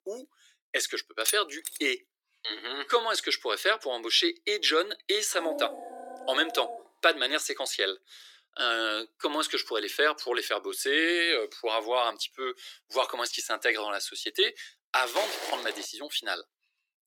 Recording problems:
thin; very; fading below 300 Hz
jangling keys; noticeable; at 1.5 s; peak 2 dB below the speech
dog barking; noticeable; from 5.5 to 7 s; peak 9 dB below the speech
footsteps; noticeable; at 15 s; peak 5 dB below the speech

